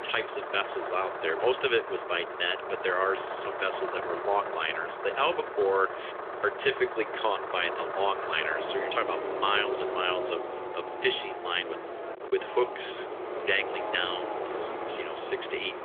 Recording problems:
phone-call audio; nothing above 3.5 kHz
traffic noise; loud; throughout; 5 dB below the speech

